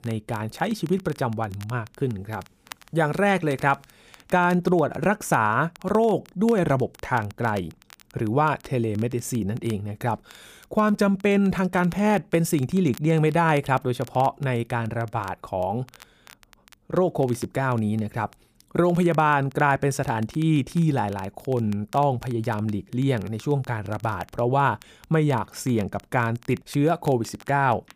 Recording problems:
crackle, like an old record; faint; 25 dB below the speech

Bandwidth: 15 kHz